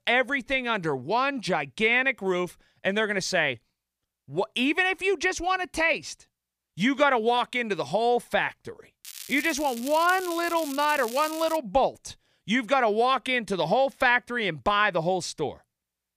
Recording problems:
crackling; noticeable; from 9 to 12 s; 15 dB below the speech

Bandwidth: 15 kHz